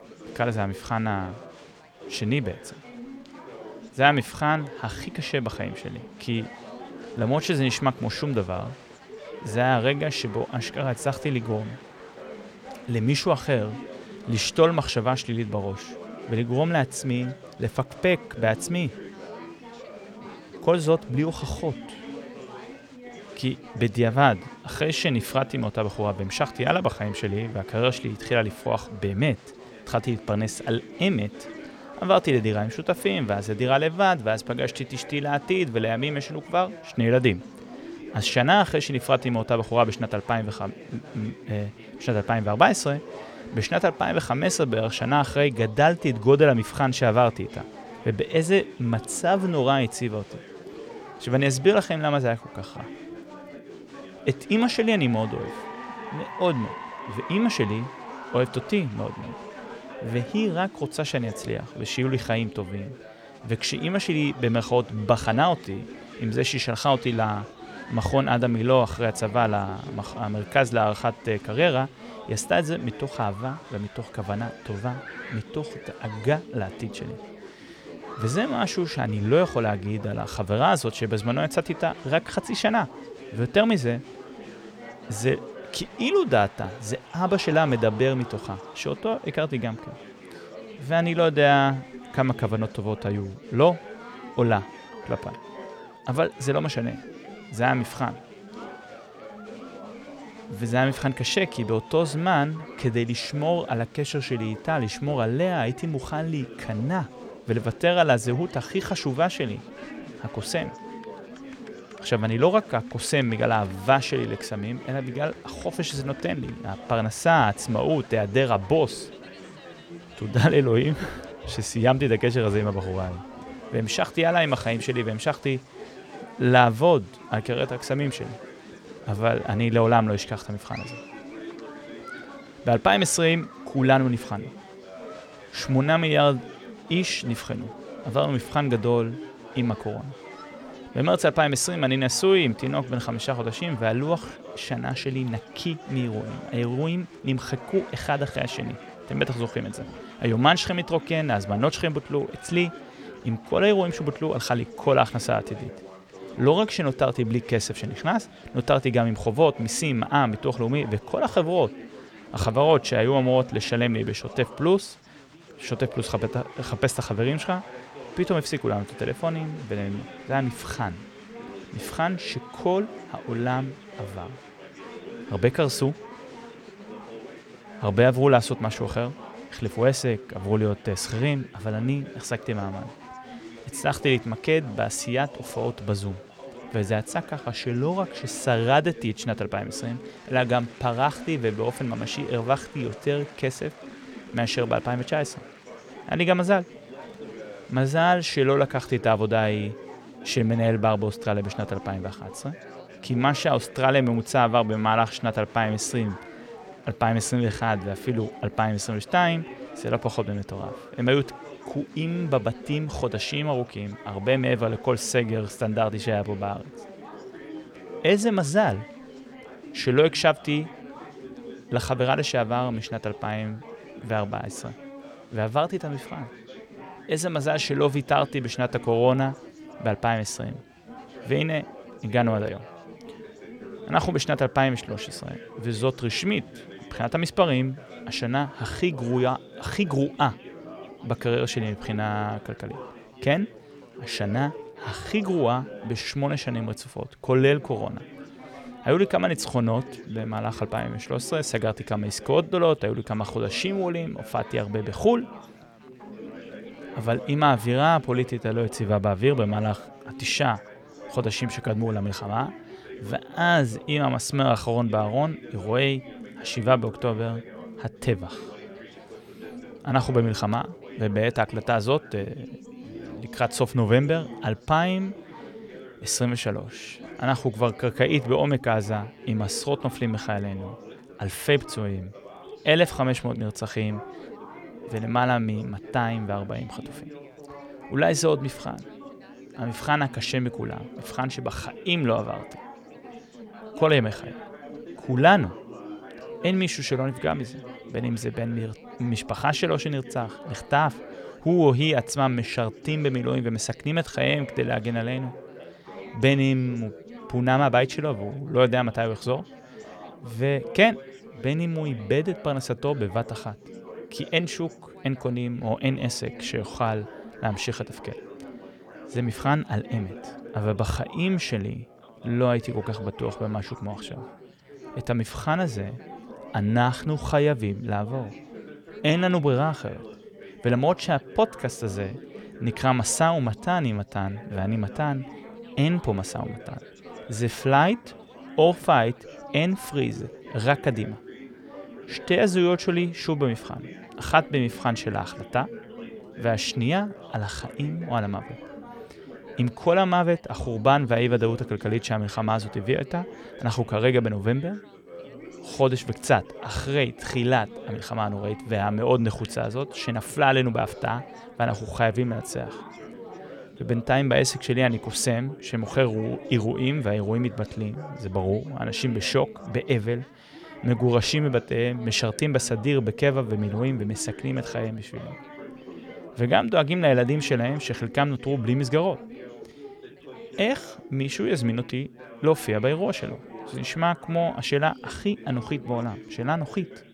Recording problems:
chatter from many people; noticeable; throughout; 15 dB below the speech

